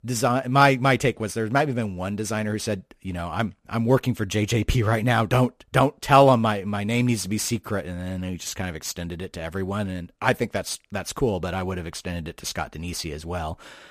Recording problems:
none

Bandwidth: 14.5 kHz